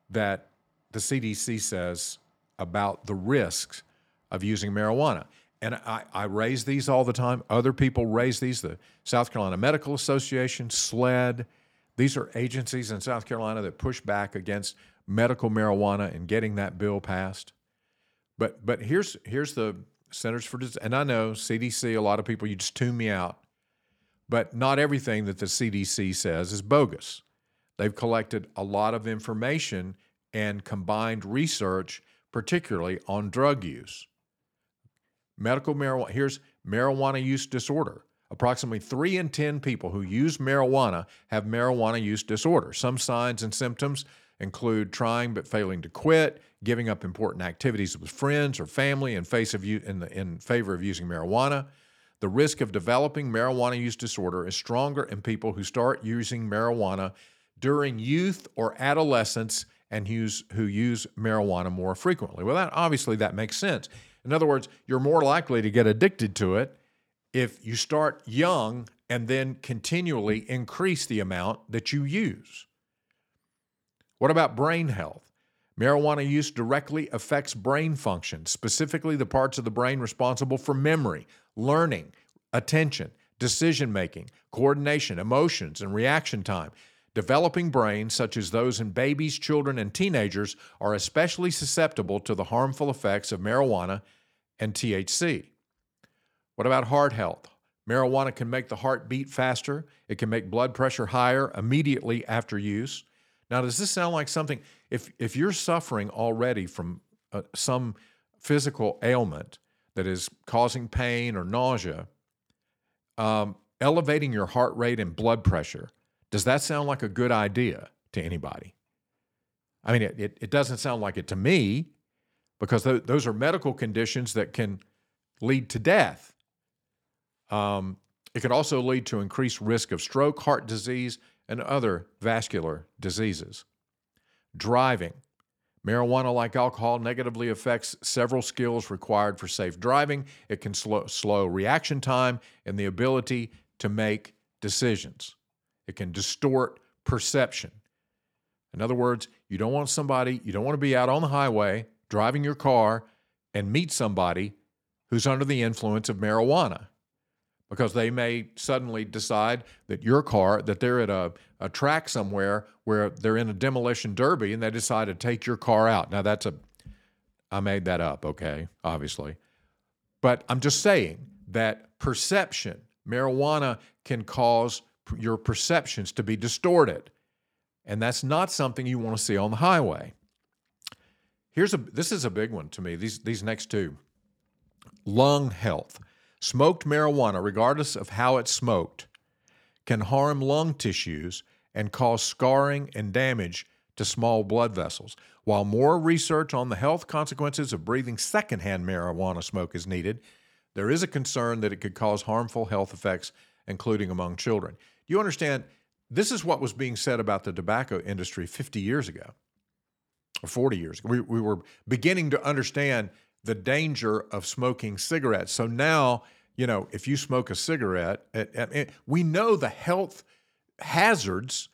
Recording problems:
none

